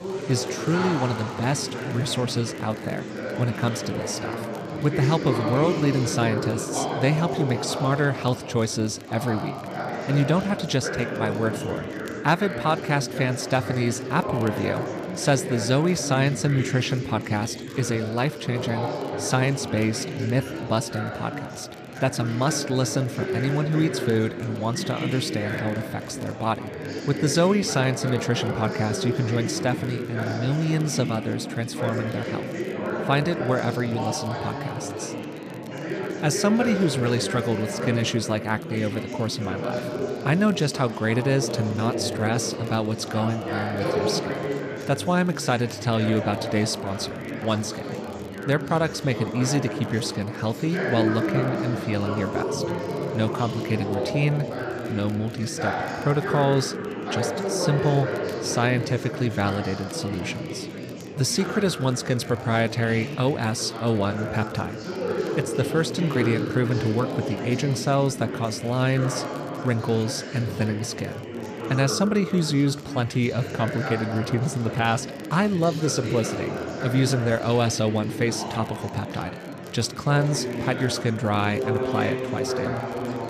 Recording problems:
chatter from many people; loud; throughout; 5 dB below the speech
household noises; faint; throughout; 25 dB below the speech
crackle, like an old record; faint; 30 dB below the speech

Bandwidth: 14.5 kHz